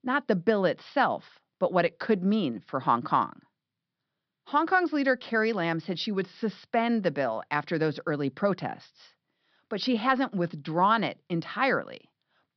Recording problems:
high frequencies cut off; noticeable; nothing above 5.5 kHz

